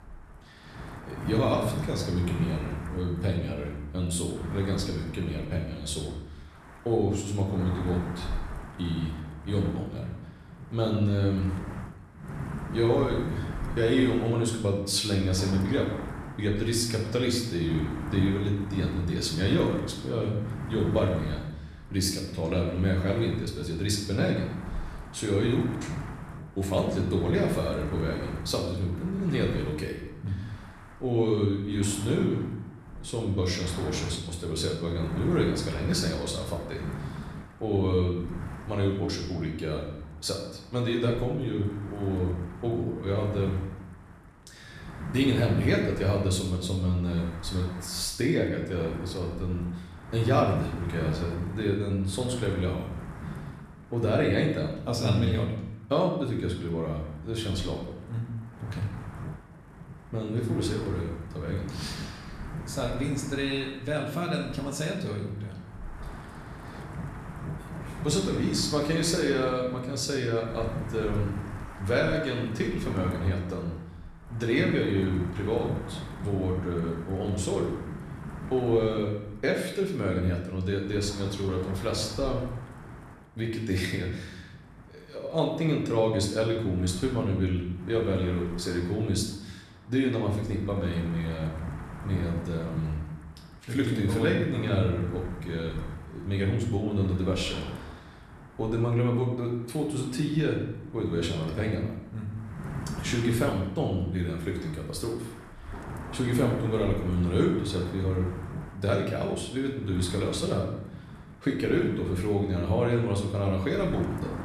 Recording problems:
room echo; noticeable; dies away in 0.8 s
off-mic speech; somewhat distant
wind noise on the microphone; occasional gusts; 15 dB below the speech

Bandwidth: 14 kHz